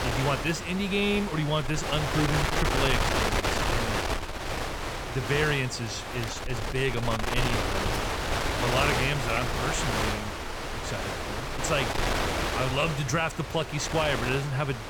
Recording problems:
wind noise on the microphone; heavy; as loud as the speech

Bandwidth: 18.5 kHz